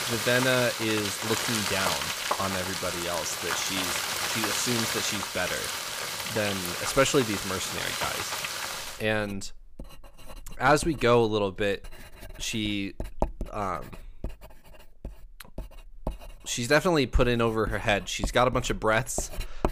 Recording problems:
household noises; loud; throughout; 3 dB below the speech

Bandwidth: 15 kHz